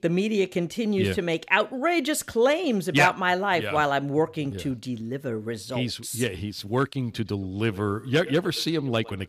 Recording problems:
echo of what is said; faint; from 7 s on; 110 ms later, 20 dB below the speech

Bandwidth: 14.5 kHz